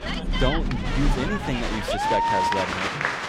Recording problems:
crowd noise; very loud; throughout; 3 dB above the speech
rain or running water; loud; until 1.5 s; 1 dB below the speech

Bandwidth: 18.5 kHz